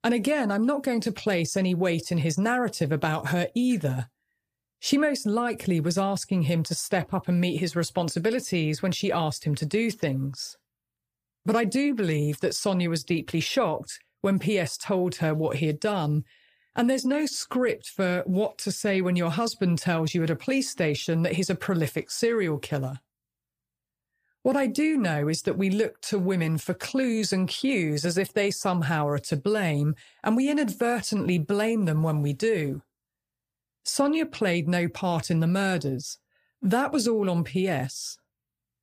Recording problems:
none

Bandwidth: 15 kHz